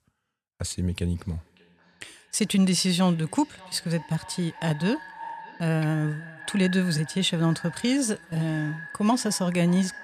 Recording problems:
echo of what is said; noticeable; throughout; 590 ms later, 15 dB below the speech

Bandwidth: 14 kHz